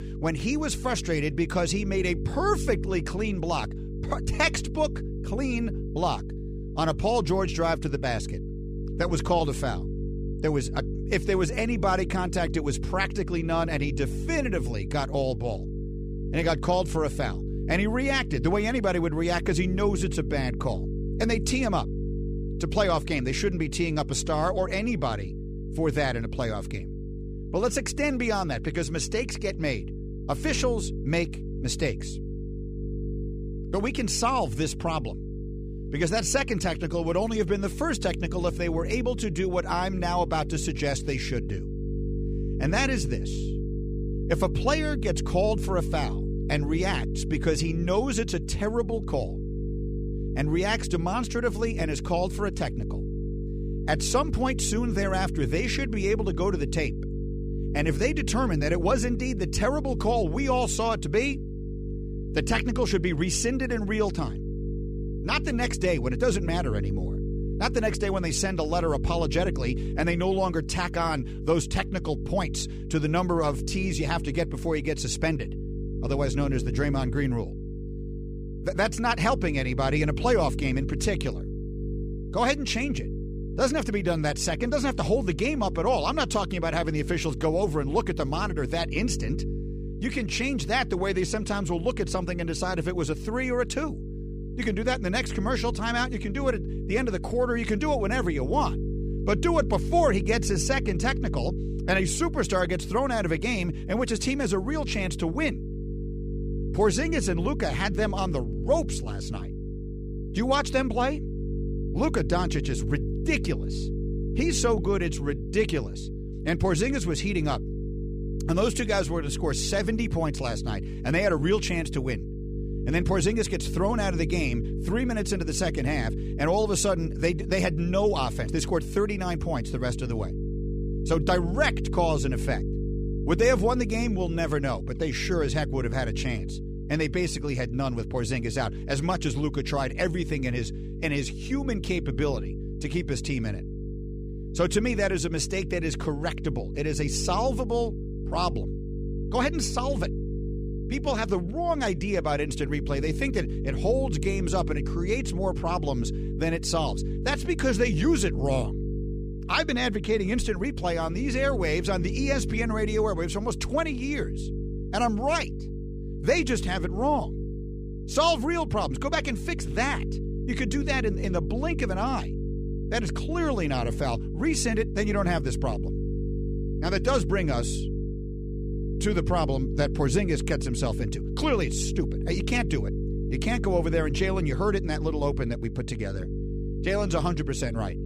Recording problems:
electrical hum; noticeable; throughout; 50 Hz, 10 dB below the speech

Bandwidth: 15 kHz